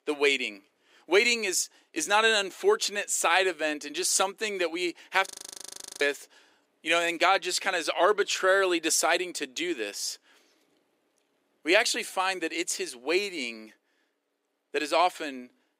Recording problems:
thin; somewhat; fading below 350 Hz
audio freezing; at 5.5 s for 0.5 s

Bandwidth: 15.5 kHz